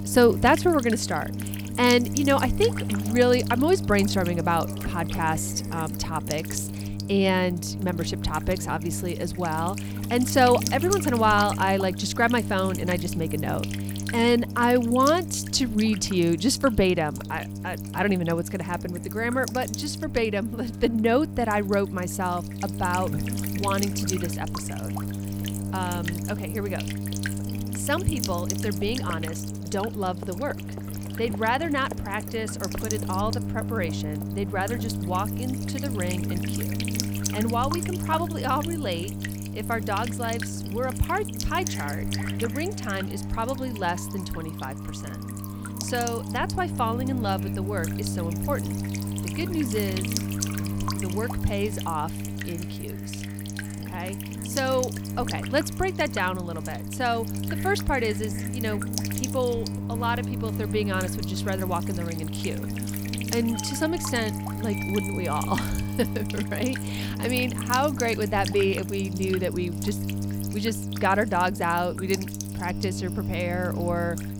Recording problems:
electrical hum; loud; throughout; 50 Hz, 10 dB below the speech
alarms or sirens; faint; throughout; 25 dB below the speech
animal sounds; faint; throughout; 25 dB below the speech

